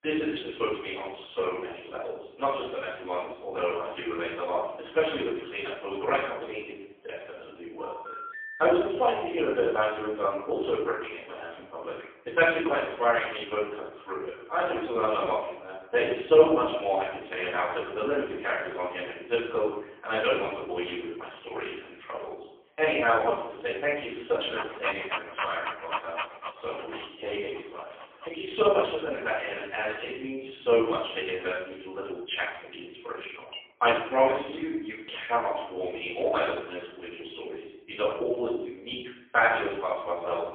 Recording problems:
phone-call audio; poor line; nothing above 3.5 kHz
off-mic speech; far
room echo; noticeable; dies away in 0.7 s
echo of what is said; faint; throughout; 110 ms later, 25 dB below the speech
uneven, jittery; strongly; from 6 to 34 s
phone ringing; noticeable; at 8 s; peak 10 dB below the speech
dog barking; noticeable; from 25 to 28 s; peak 3 dB below the speech
clattering dishes; faint; at 34 s; peak 15 dB below the speech

